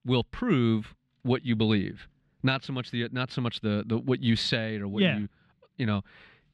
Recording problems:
muffled; very slightly; fading above 3.5 kHz

